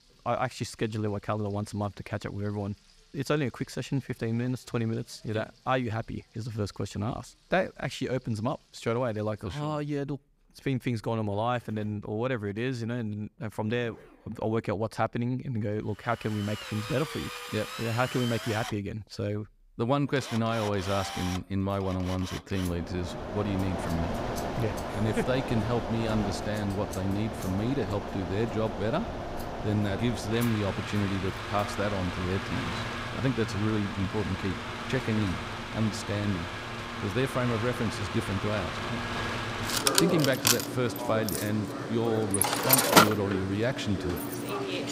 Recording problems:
echo of what is said; faint; from 20 s on; 90 ms later, 20 dB below the speech
machinery noise; loud; from 16 s on; 1 dB below the speech
household noises; faint; throughout; 20 dB below the speech

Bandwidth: 15.5 kHz